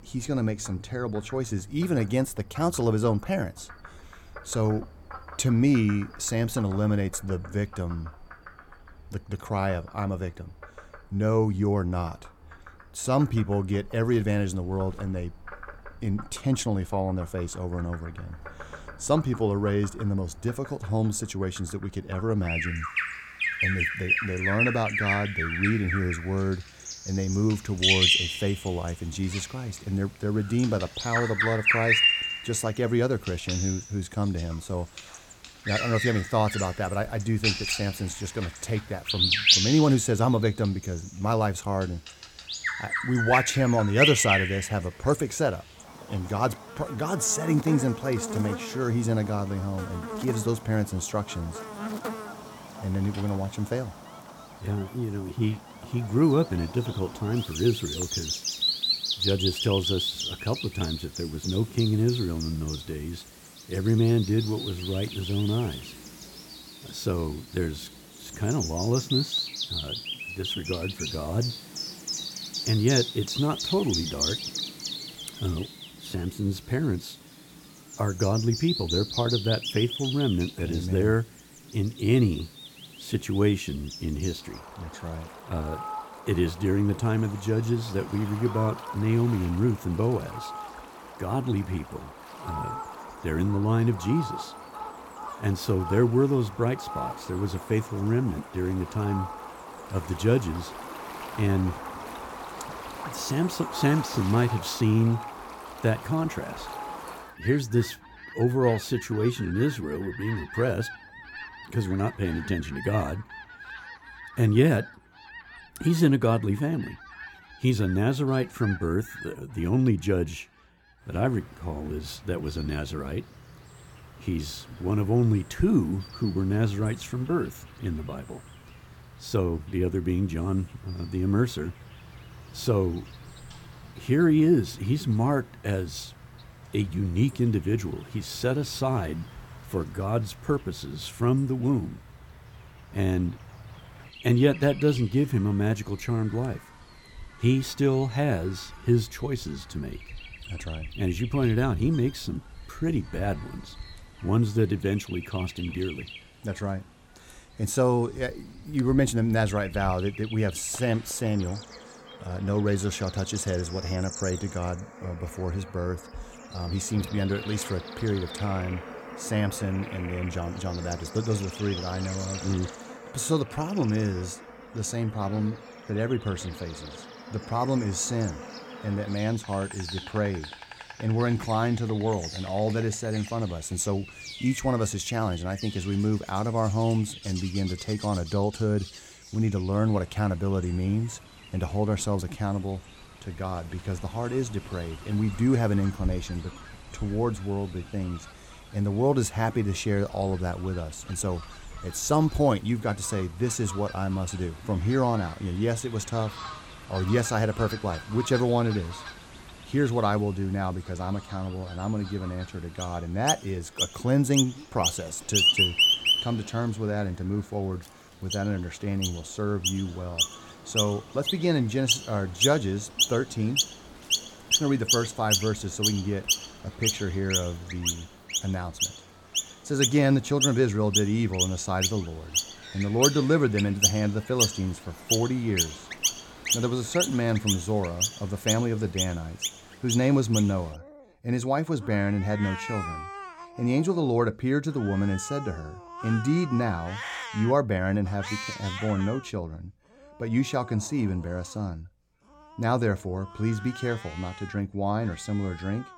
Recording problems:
animal sounds; loud; throughout; 3 dB below the speech

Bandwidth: 17 kHz